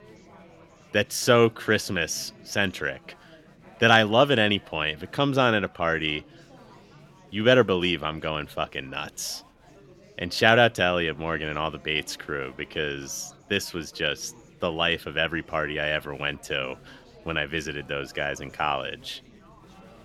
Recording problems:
chatter from many people; faint; throughout; 25 dB below the speech

